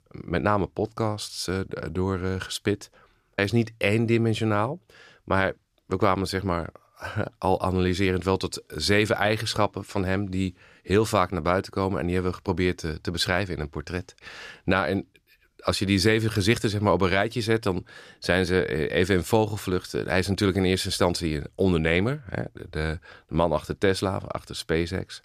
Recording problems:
none

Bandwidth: 14.5 kHz